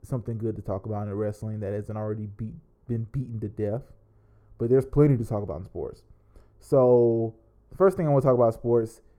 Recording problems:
muffled; very; fading above 1.5 kHz

